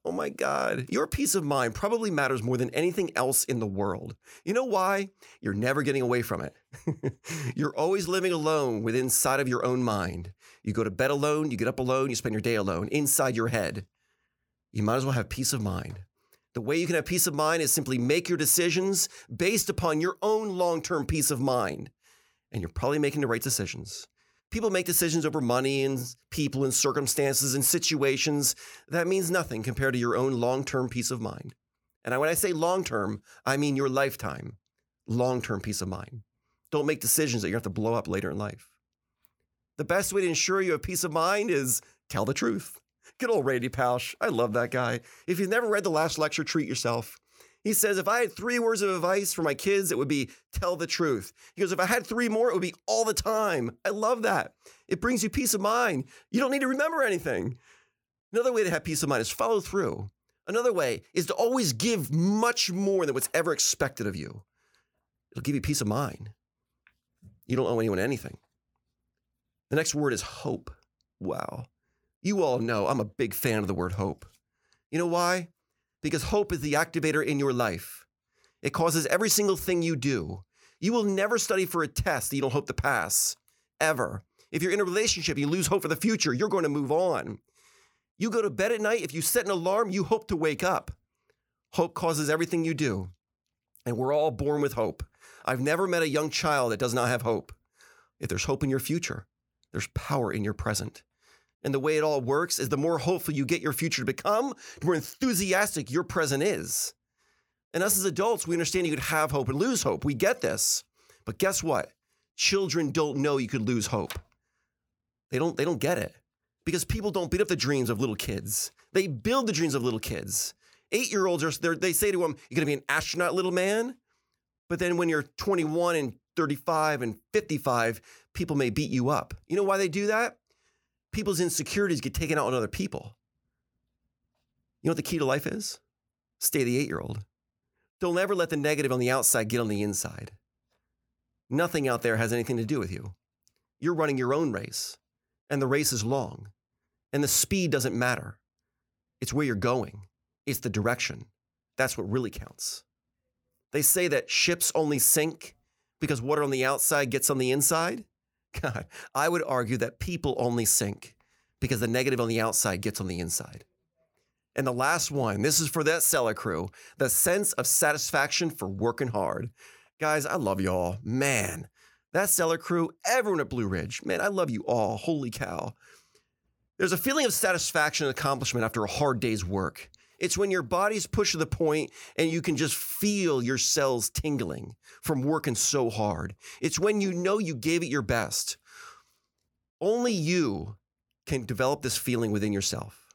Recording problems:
none

